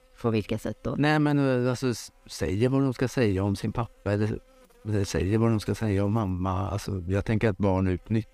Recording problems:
electrical hum; faint; throughout; 60 Hz, 30 dB below the speech

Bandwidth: 15 kHz